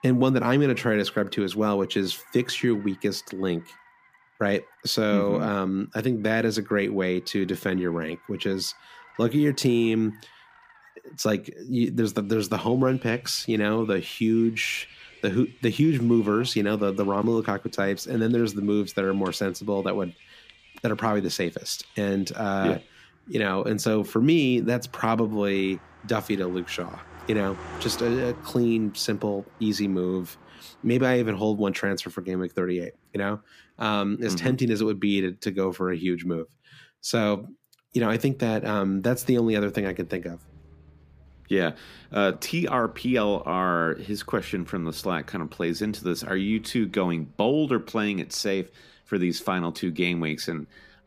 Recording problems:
traffic noise; faint; throughout; 25 dB below the speech

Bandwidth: 15 kHz